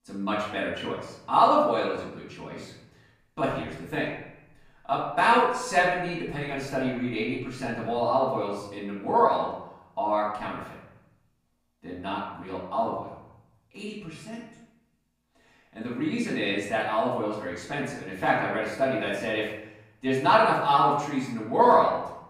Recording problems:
off-mic speech; far
room echo; noticeable; dies away in 0.8 s

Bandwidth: 15 kHz